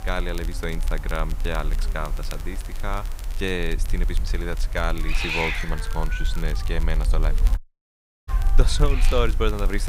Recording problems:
hiss; loud; throughout; 5 dB below the speech
crackle, like an old record; noticeable; 15 dB below the speech
low rumble; faint; throughout; 20 dB below the speech
audio cutting out; at 7.5 s for 0.5 s
abrupt cut into speech; at the end

